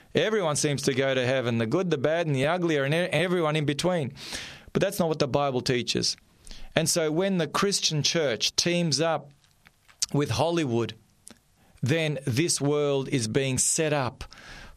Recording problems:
squashed, flat; somewhat

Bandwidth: 14 kHz